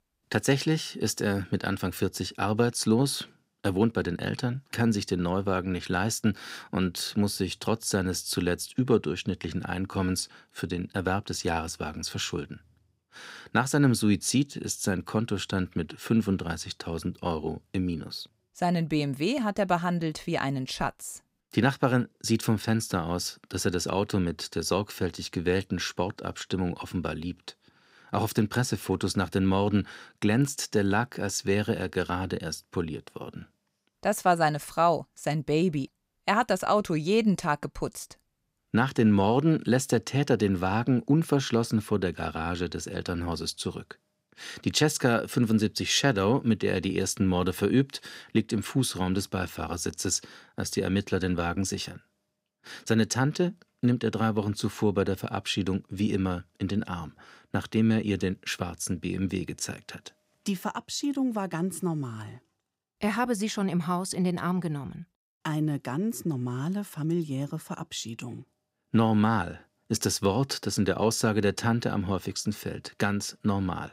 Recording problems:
none

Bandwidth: 15.5 kHz